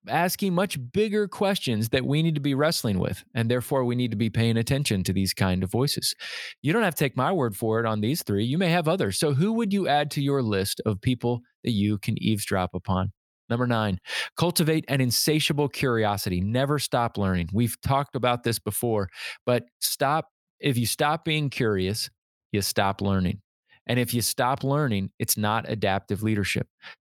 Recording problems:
none

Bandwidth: 18.5 kHz